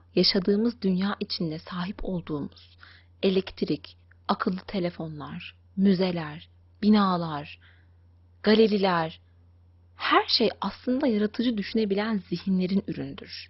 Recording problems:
garbled, watery; badly; nothing above 5.5 kHz

